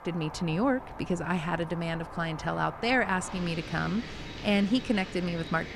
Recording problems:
wind in the background; noticeable; throughout; 10 dB below the speech

